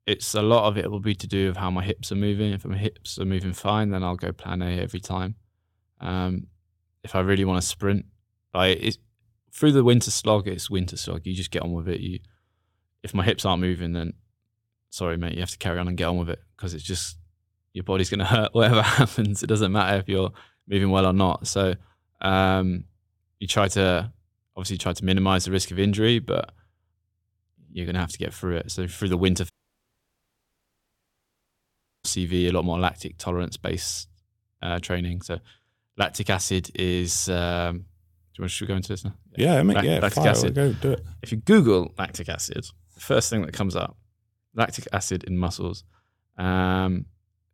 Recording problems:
audio cutting out; at 30 s for 2.5 s

